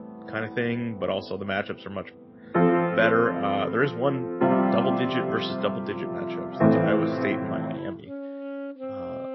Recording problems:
garbled, watery; slightly; nothing above 5.5 kHz
background music; very loud; throughout; 2 dB above the speech

